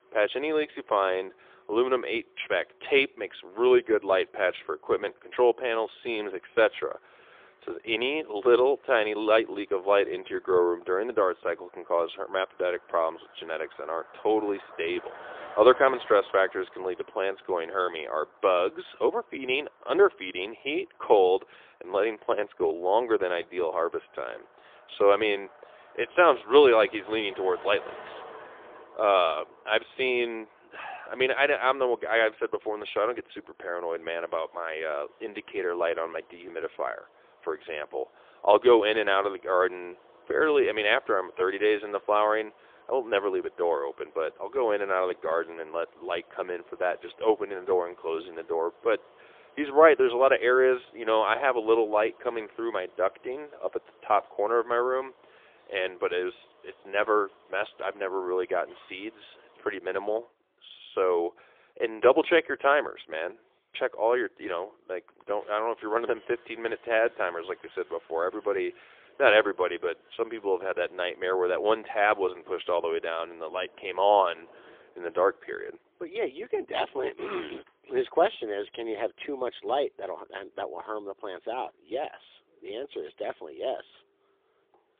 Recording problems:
phone-call audio; poor line; nothing above 3.5 kHz
traffic noise; faint; throughout; 25 dB below the speech

